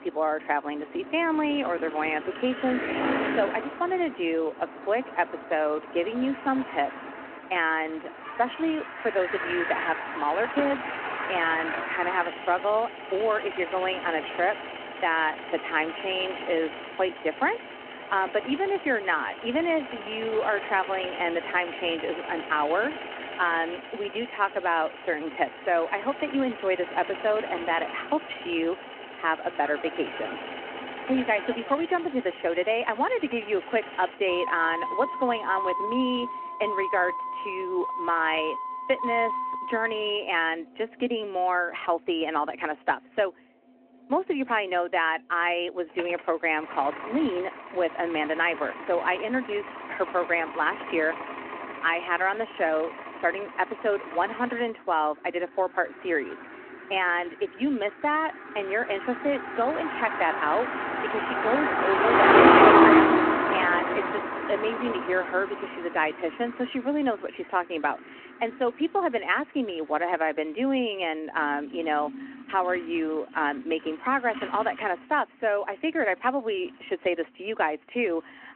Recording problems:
phone-call audio
traffic noise; loud; throughout; 1 dB below the speech

